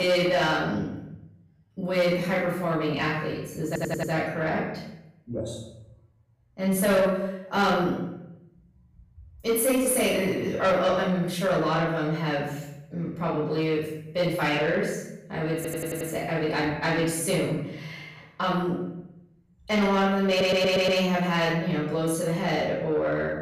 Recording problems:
off-mic speech; far
room echo; noticeable; dies away in 0.8 s
distortion; slight; 10 dB below the speech
abrupt cut into speech; at the start
audio stuttering; at 3.5 s, at 16 s and at 20 s

